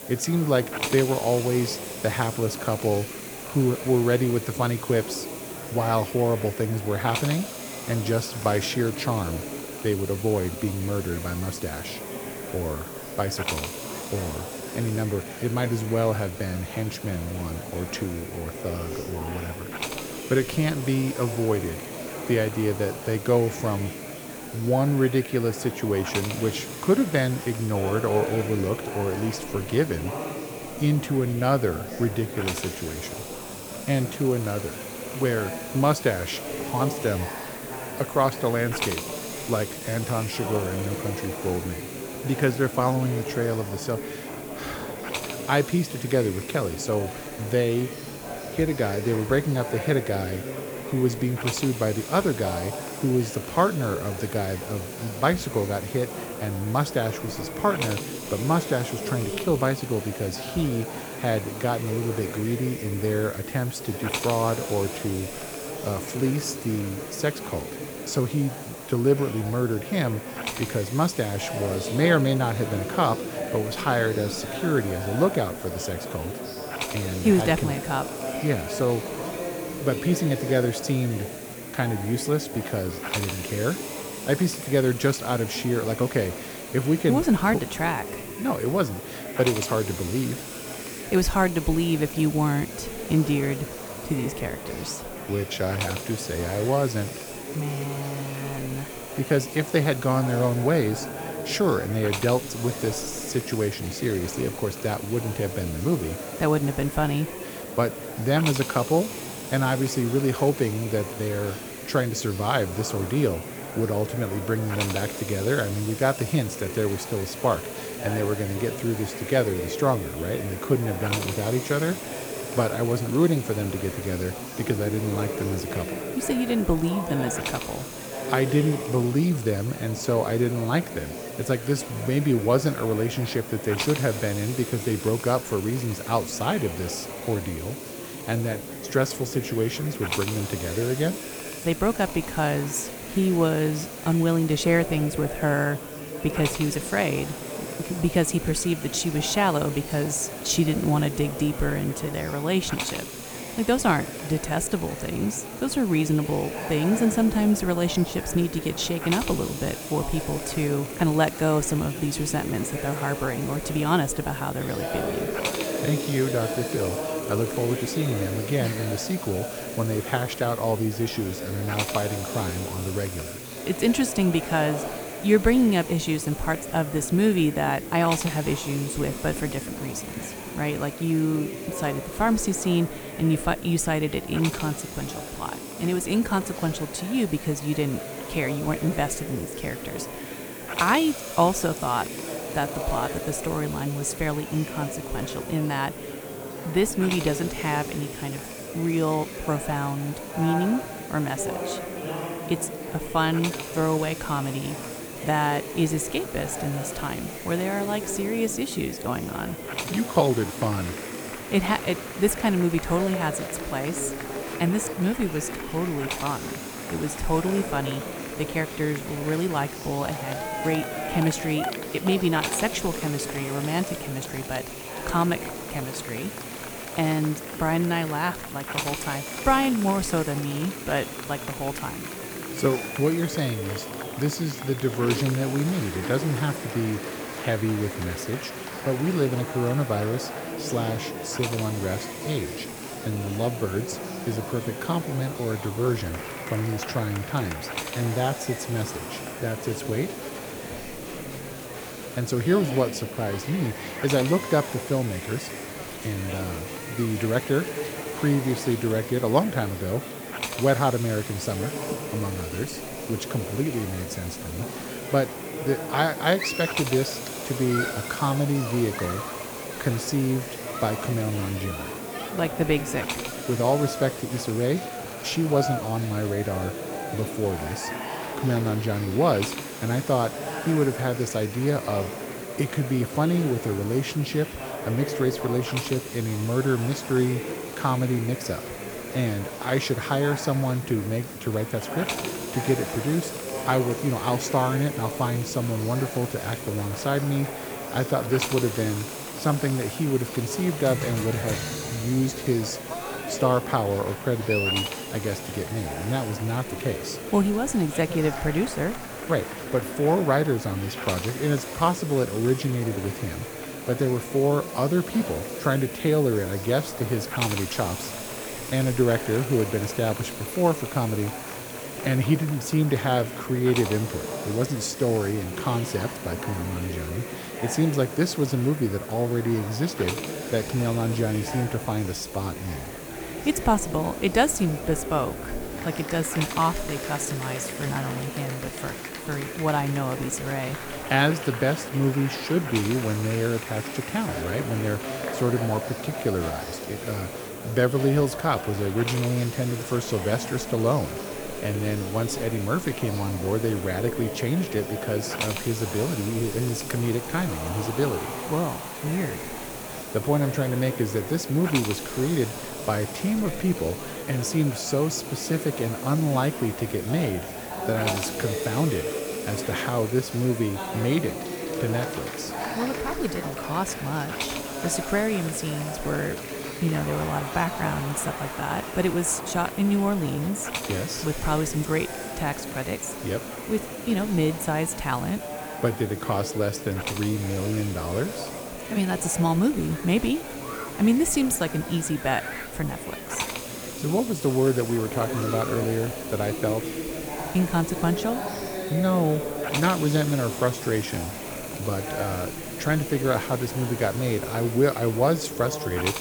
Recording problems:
murmuring crowd; loud; throughout; 9 dB below the speech
hiss; noticeable; throughout; 10 dB below the speech

